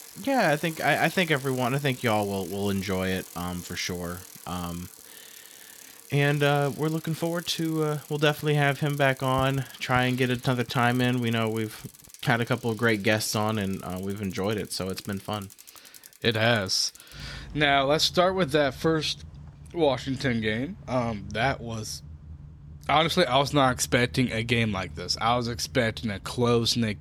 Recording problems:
traffic noise; noticeable; throughout; 20 dB below the speech

